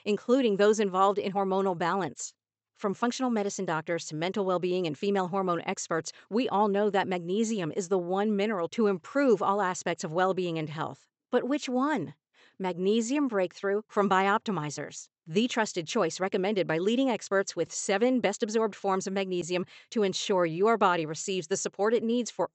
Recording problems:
high frequencies cut off; noticeable; nothing above 8 kHz

